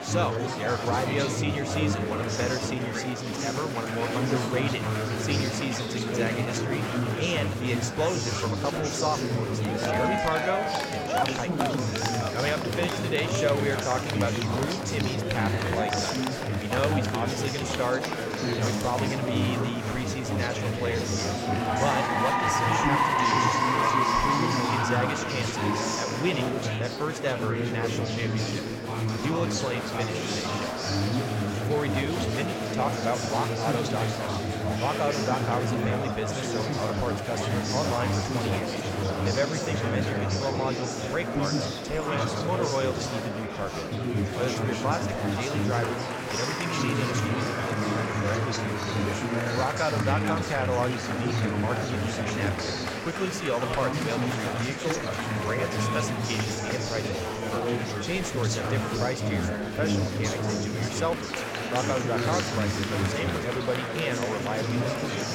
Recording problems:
murmuring crowd; very loud; throughout; 4 dB above the speech

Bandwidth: 16.5 kHz